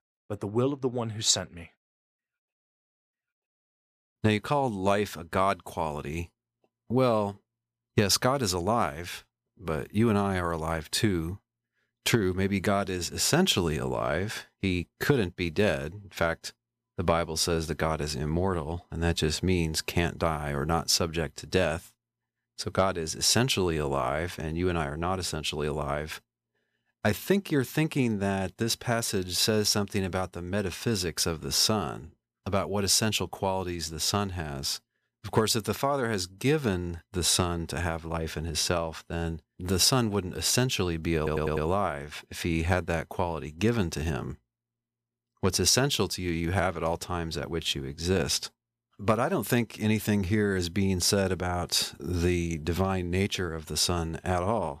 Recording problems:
audio stuttering; at 41 s

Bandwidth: 14.5 kHz